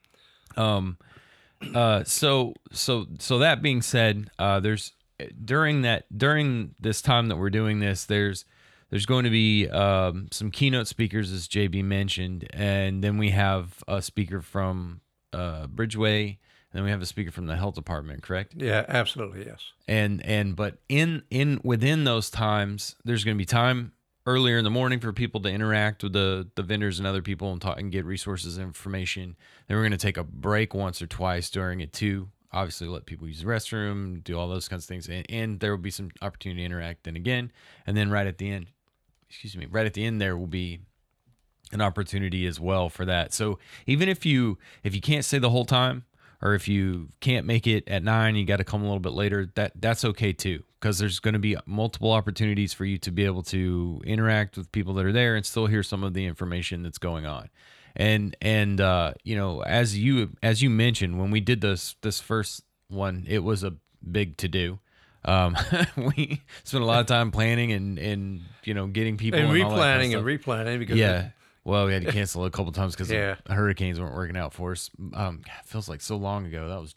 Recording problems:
none

